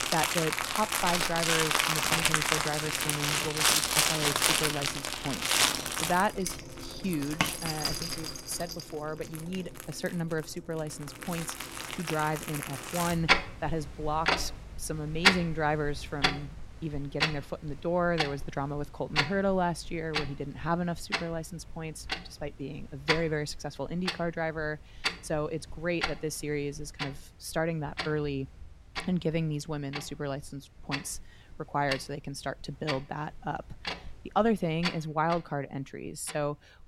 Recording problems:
household noises; very loud; throughout; 4 dB above the speech

